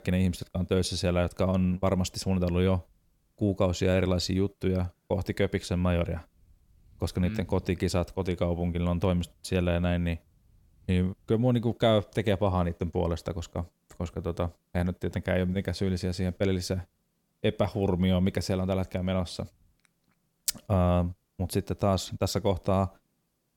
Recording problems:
none

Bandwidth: 17.5 kHz